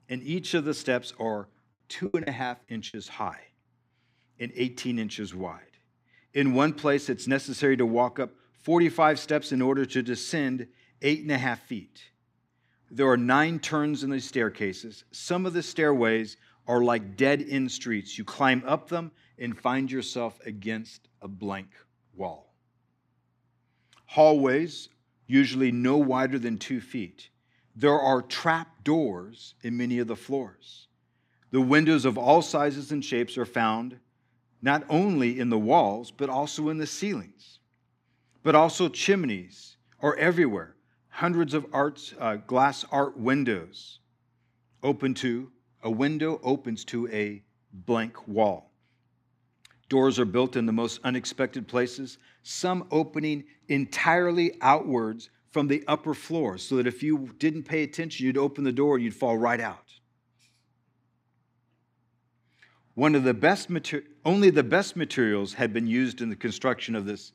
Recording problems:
choppy; very; at 2 s; 5% of the speech affected

